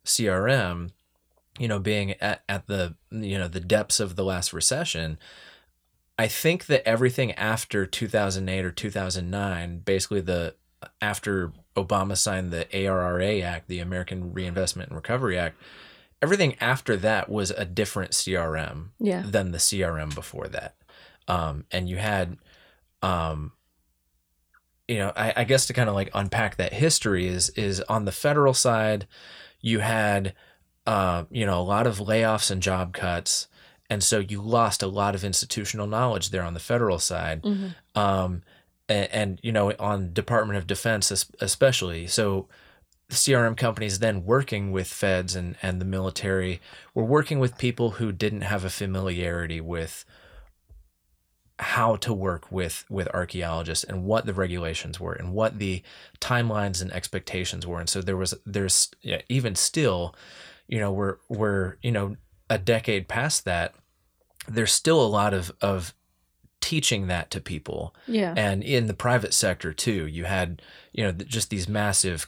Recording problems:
none

